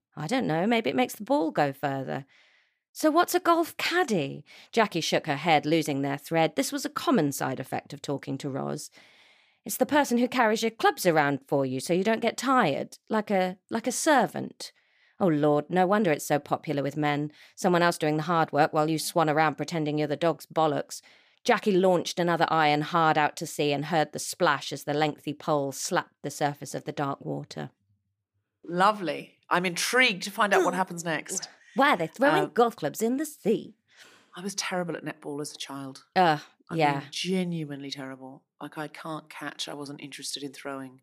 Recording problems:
none

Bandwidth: 15 kHz